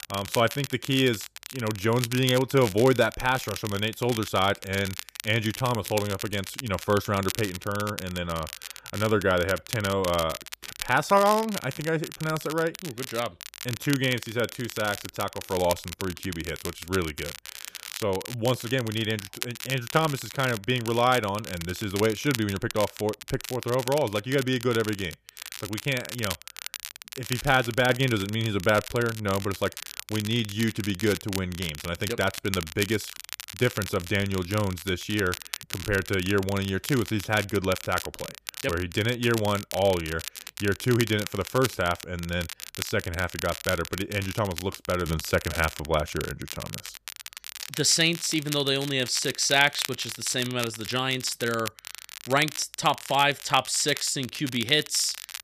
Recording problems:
crackle, like an old record; noticeable; 10 dB below the speech

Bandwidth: 14.5 kHz